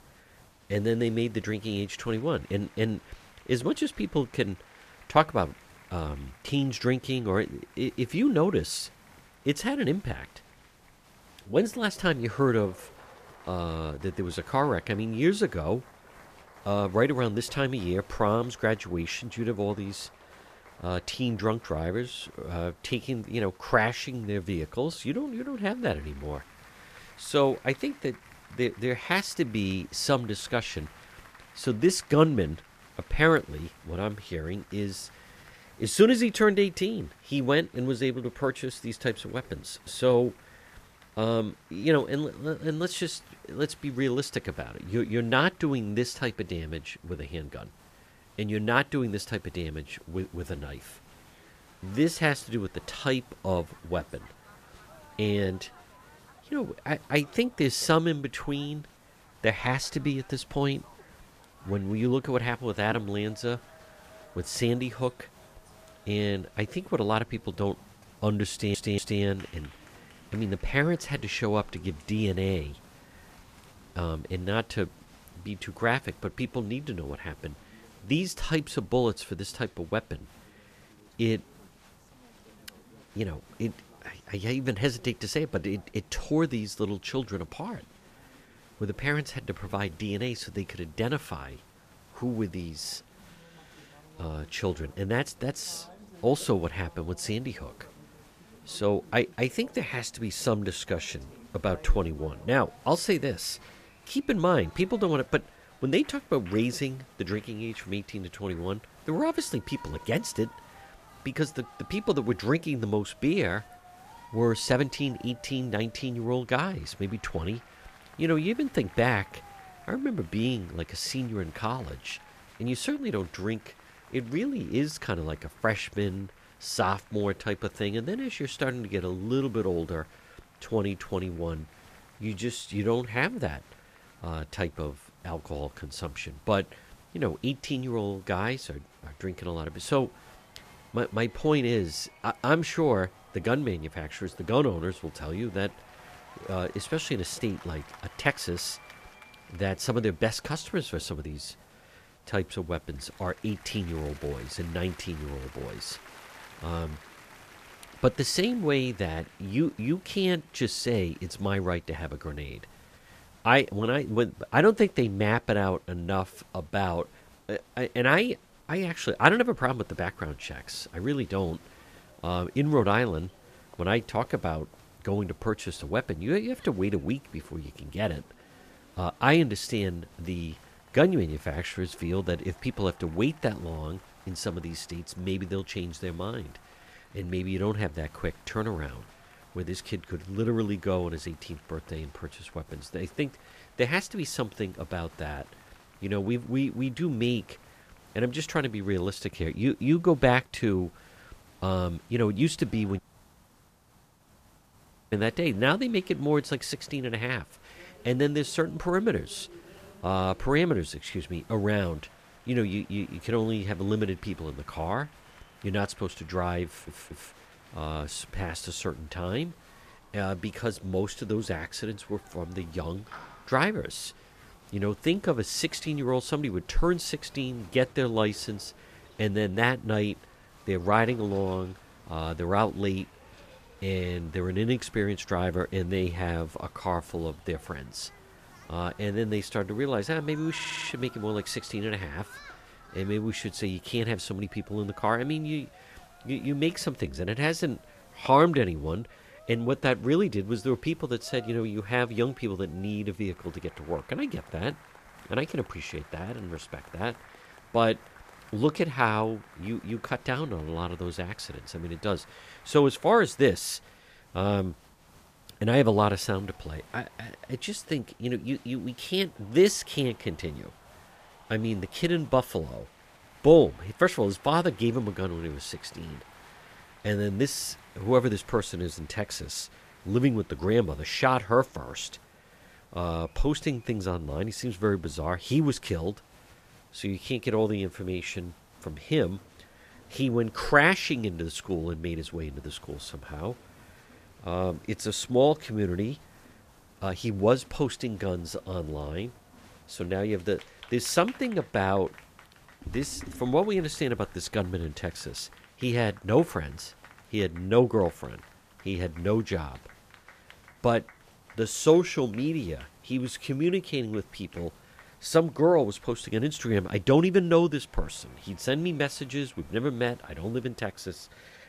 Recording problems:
crowd noise; faint; throughout; 25 dB below the speech
hiss; faint; throughout; 30 dB below the speech
audio stuttering; at 1:09, at 3:37 and at 4:01
audio cutting out; at 3:23 for 2 s

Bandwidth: 14.5 kHz